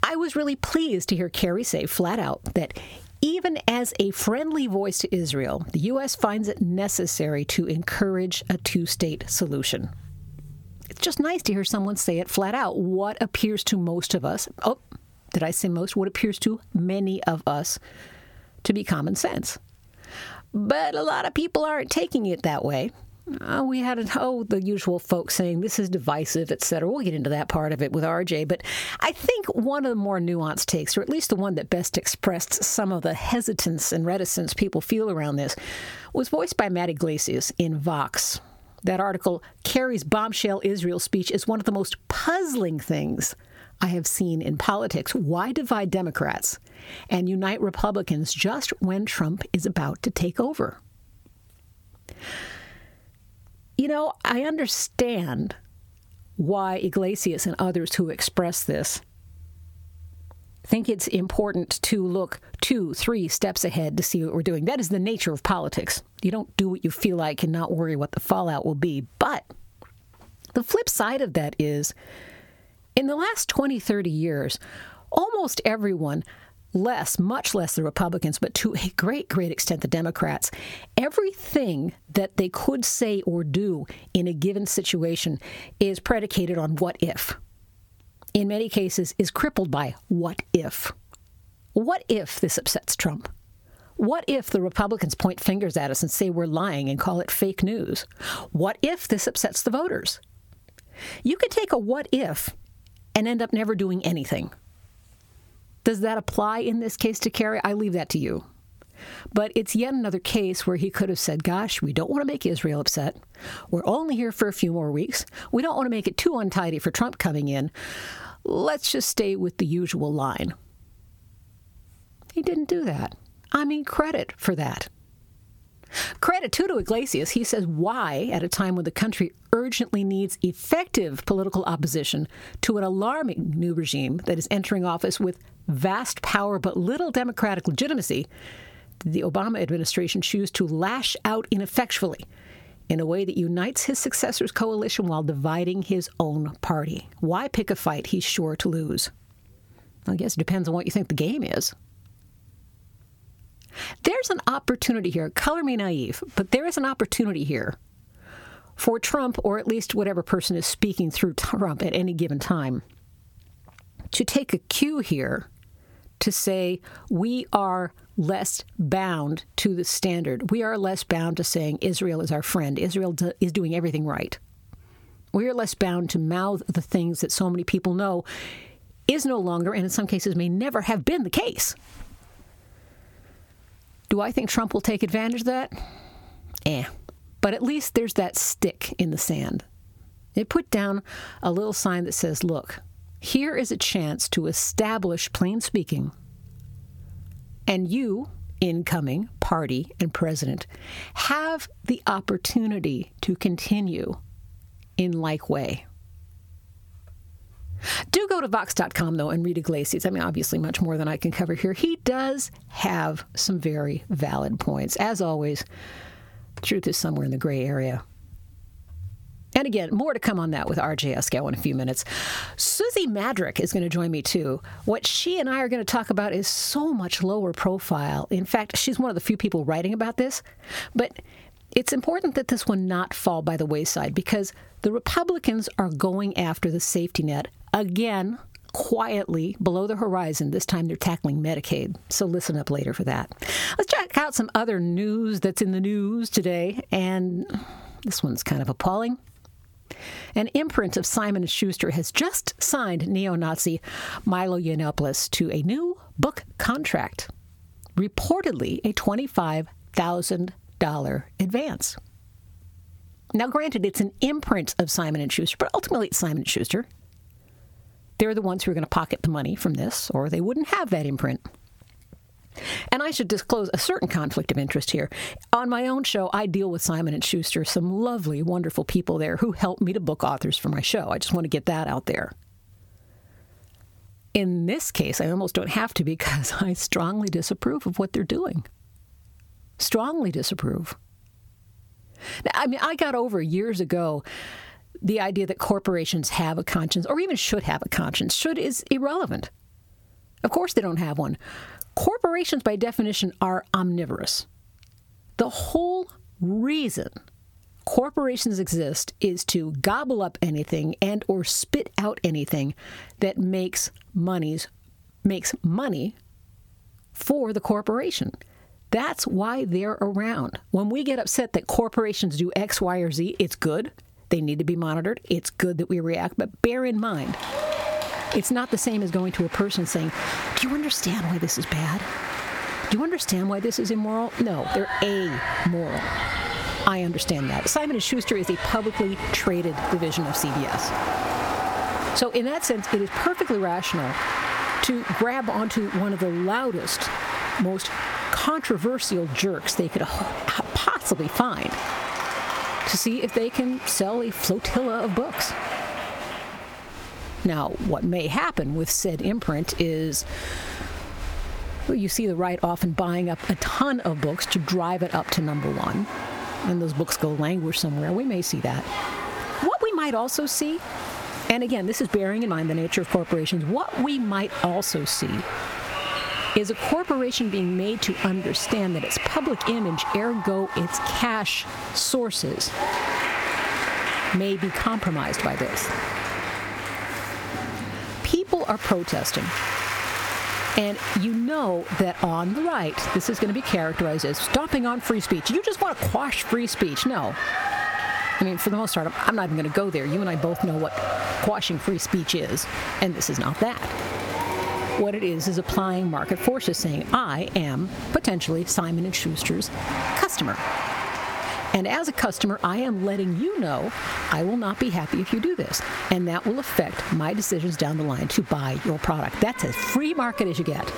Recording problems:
squashed, flat; heavily, background pumping
crowd noise; loud; from 5:27 on; 6 dB below the speech

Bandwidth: 18 kHz